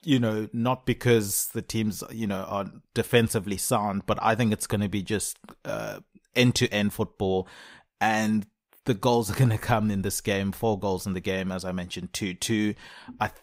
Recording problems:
none

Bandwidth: 15.5 kHz